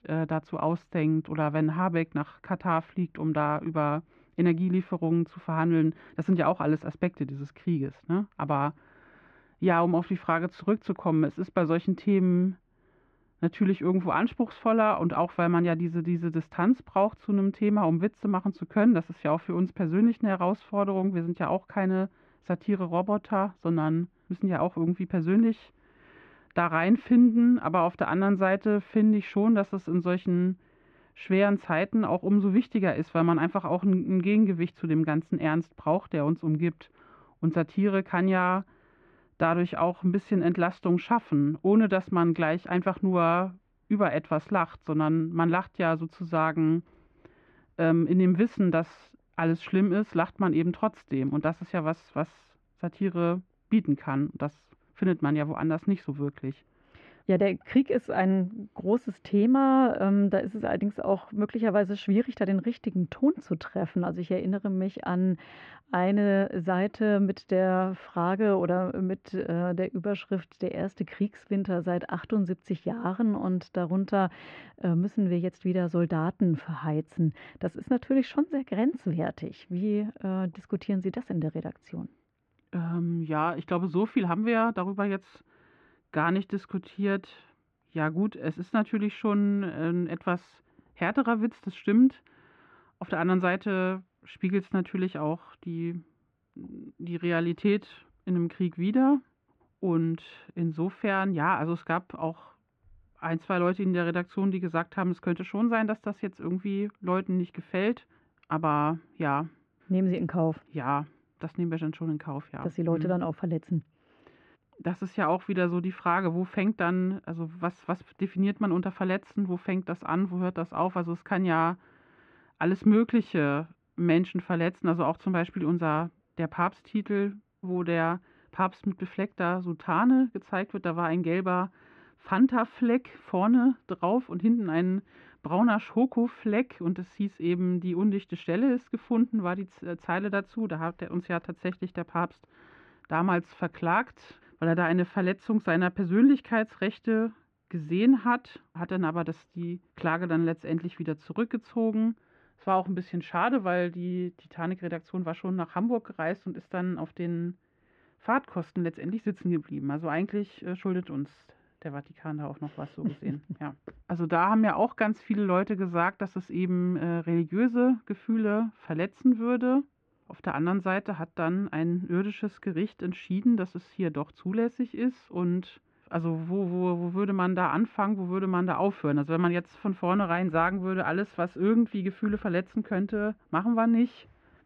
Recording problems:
muffled; very; fading above 2 kHz

